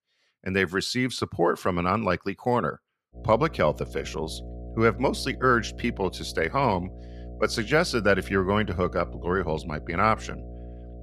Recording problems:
electrical hum; faint; from 3 s on; 60 Hz, 25 dB below the speech

